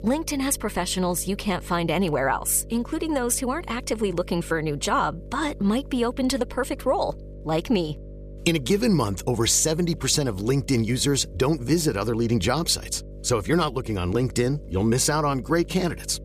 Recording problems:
electrical hum; faint; throughout; 50 Hz, 25 dB below the speech

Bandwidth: 14.5 kHz